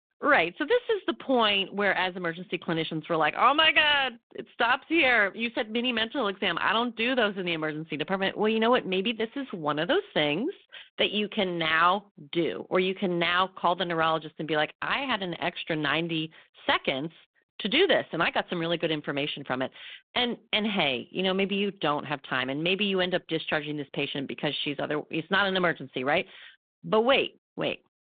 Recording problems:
phone-call audio

